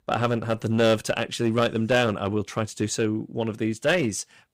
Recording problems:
distortion; slight; 4% of the sound clipped

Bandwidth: 15.5 kHz